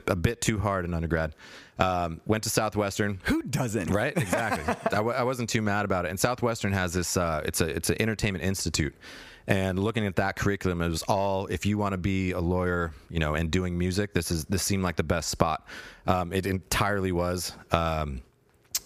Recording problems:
squashed, flat; somewhat

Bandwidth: 15 kHz